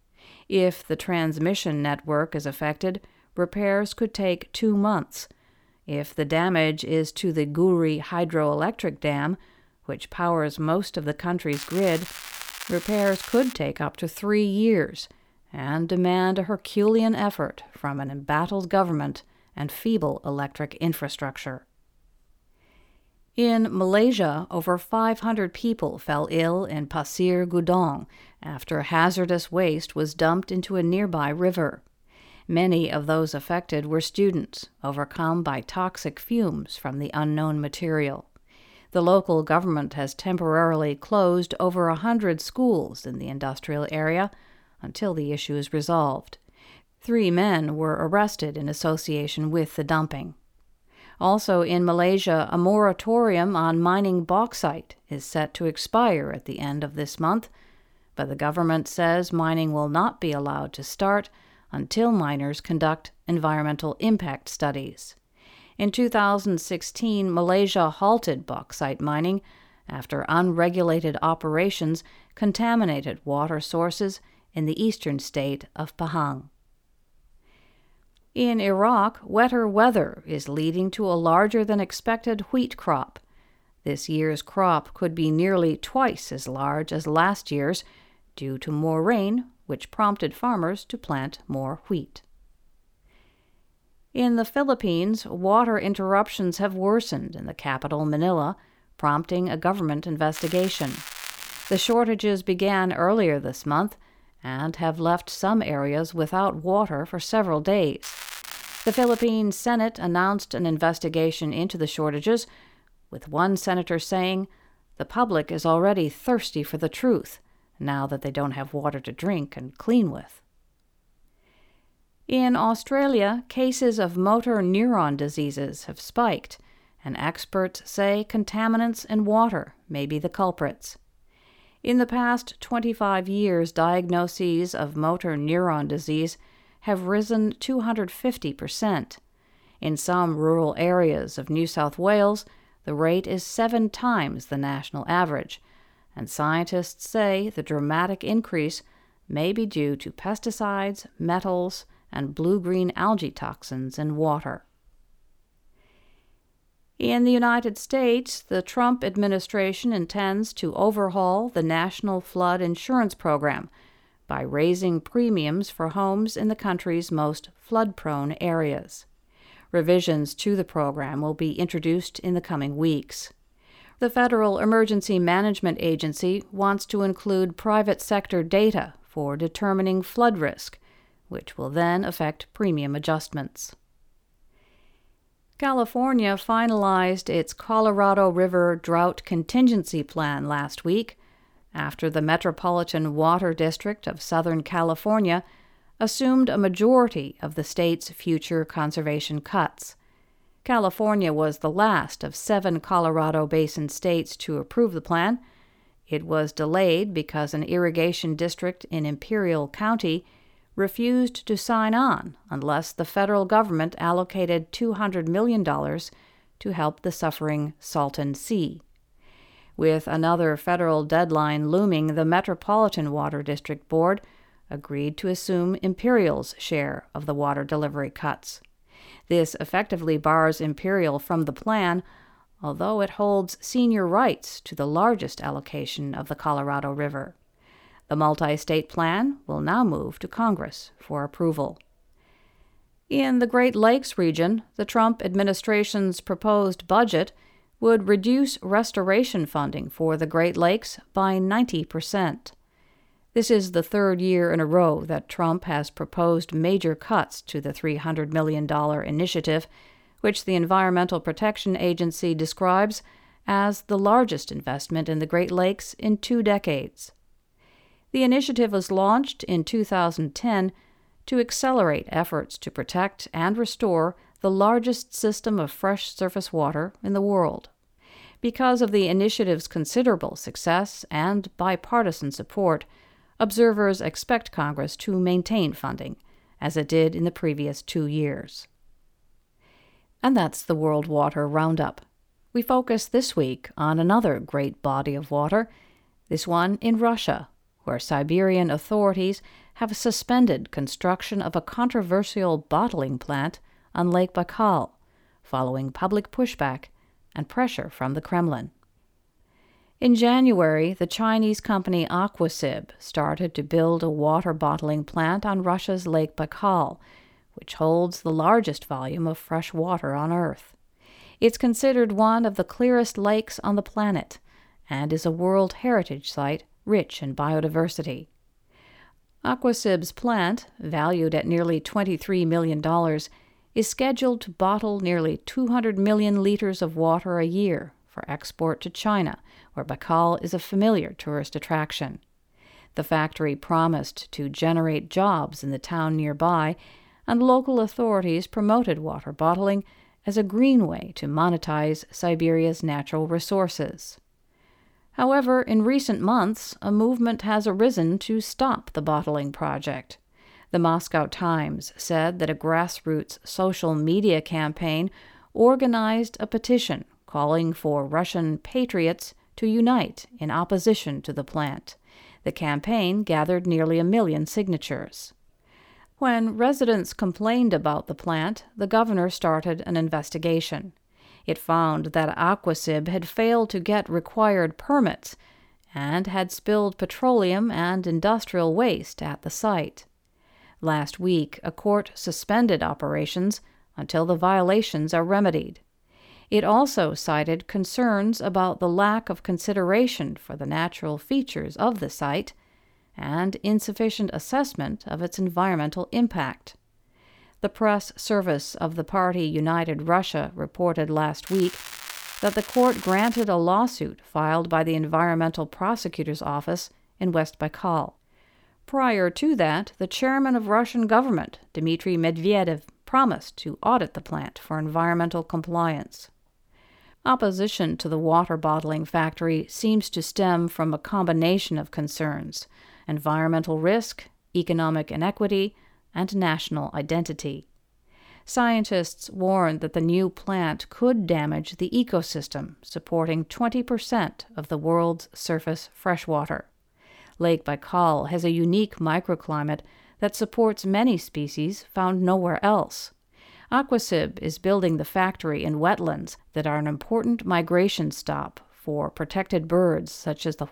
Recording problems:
crackling; noticeable; 4 times, first at 12 s; 10 dB below the speech

